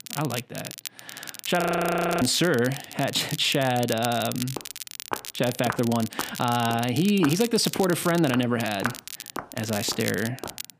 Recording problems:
crackle, like an old record; noticeable; 10 dB below the speech
audio freezing; at 1.5 s for 0.5 s
footsteps; noticeable; from 4.5 s on; peak 8 dB below the speech

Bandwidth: 15 kHz